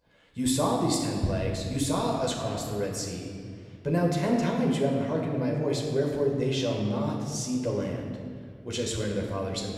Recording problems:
room echo; noticeable; dies away in 1.8 s
off-mic speech; somewhat distant

